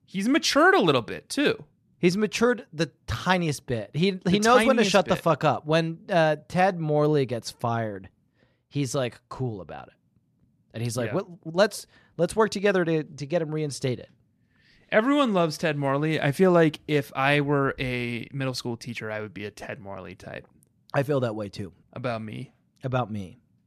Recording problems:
none

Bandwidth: 14 kHz